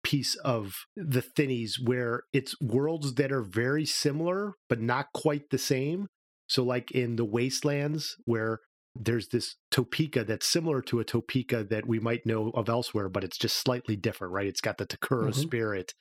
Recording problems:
squashed, flat; somewhat

